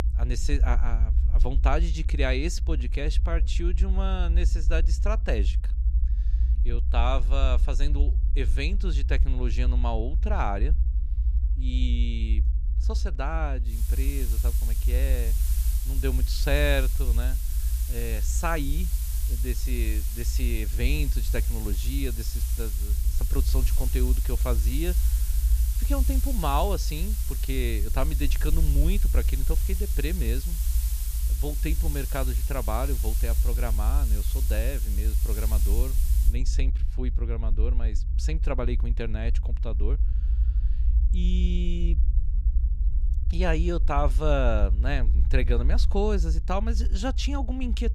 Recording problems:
hiss; loud; from 14 to 36 s; 6 dB below the speech
low rumble; noticeable; throughout; 15 dB below the speech

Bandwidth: 14.5 kHz